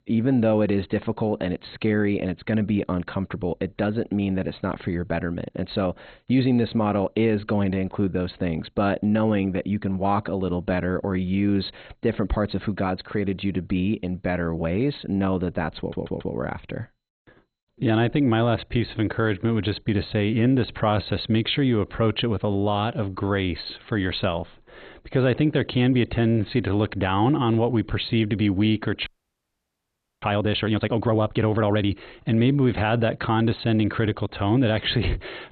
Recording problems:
garbled, watery; badly; nothing above 4 kHz
audio stuttering; at 16 s
audio freezing; at 29 s for 1 s

